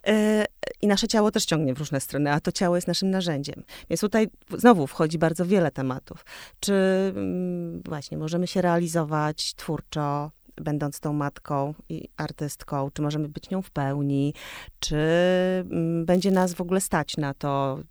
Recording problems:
crackling; faint; at 16 s; 25 dB below the speech

